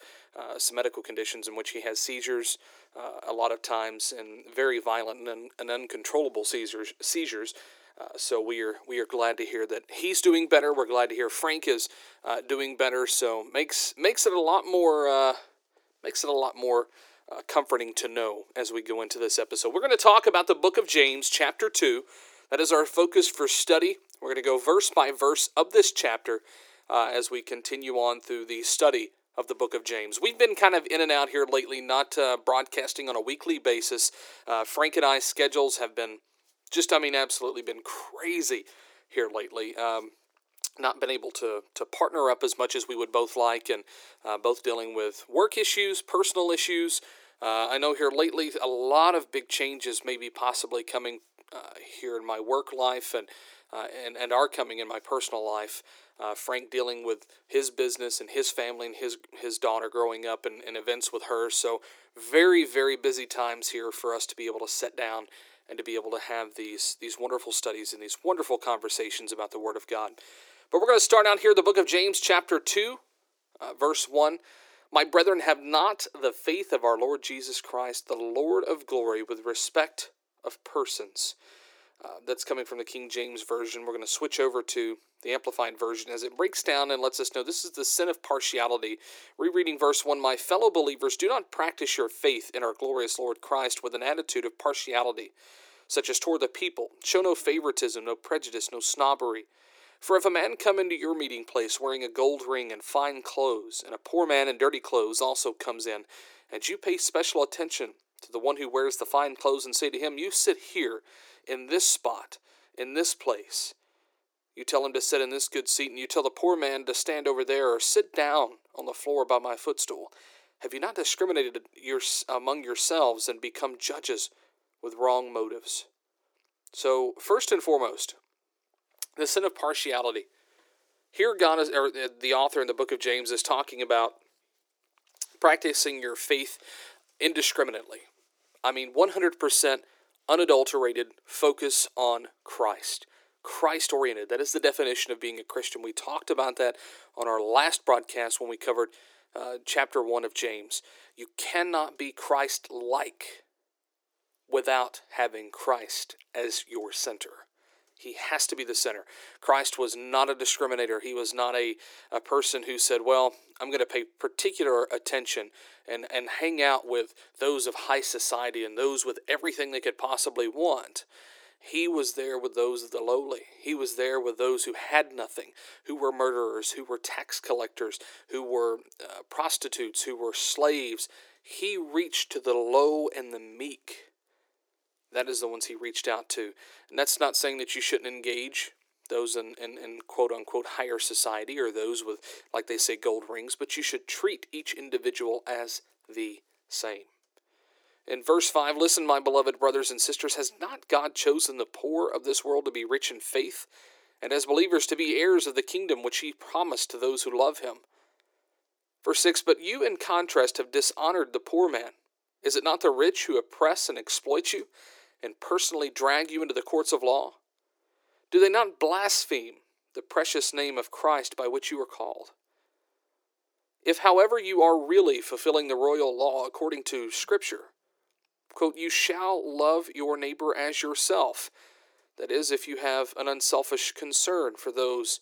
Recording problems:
thin; very; fading below 350 Hz

